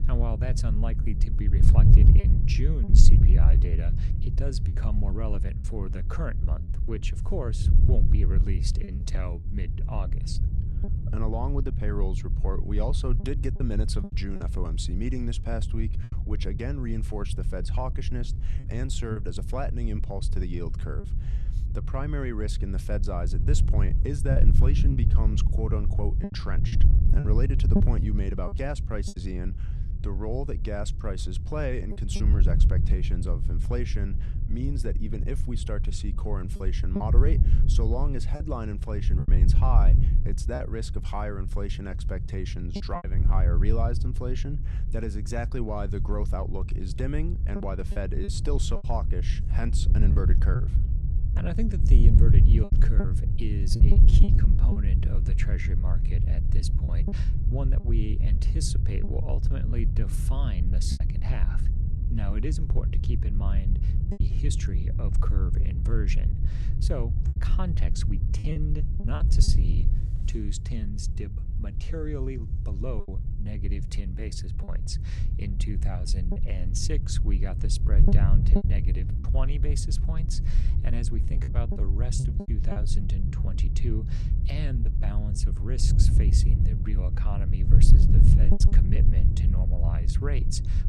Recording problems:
wind noise on the microphone; heavy; 4 dB below the speech
choppy; occasionally; 4% of the speech affected

